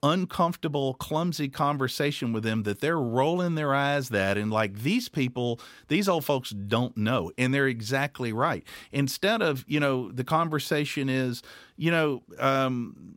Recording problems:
none

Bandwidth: 16 kHz